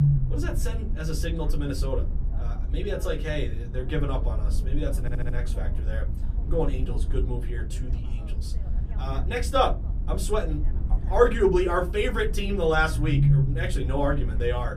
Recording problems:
off-mic speech; far
room echo; very slight; dies away in 0.2 s
low rumble; noticeable; throughout; 15 dB below the speech
voice in the background; faint; throughout; 30 dB below the speech
audio stuttering; at 5 s

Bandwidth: 14.5 kHz